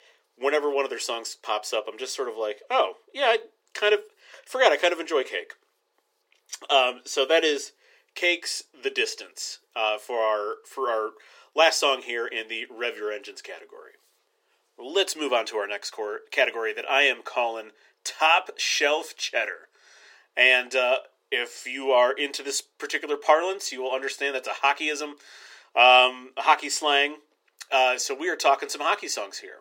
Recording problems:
thin; very; fading below 400 Hz

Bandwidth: 16.5 kHz